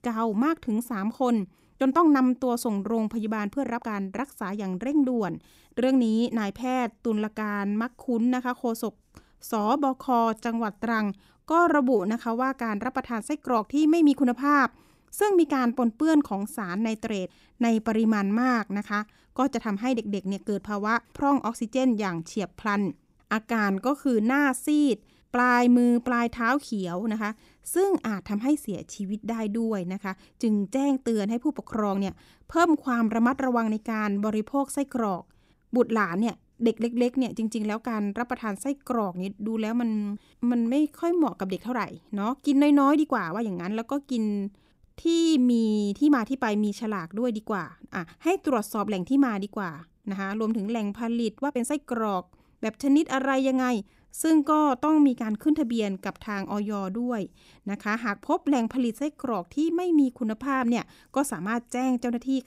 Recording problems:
uneven, jittery; strongly; from 1.5 to 59 s

